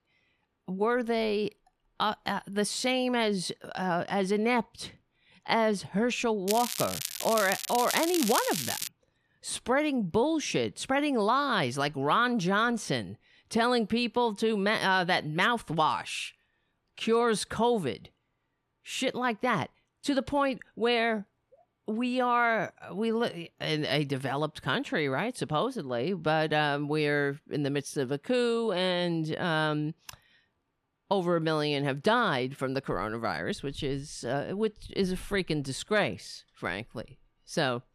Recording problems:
crackling; loud; from 6.5 to 9 s; 4 dB below the speech

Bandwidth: 14.5 kHz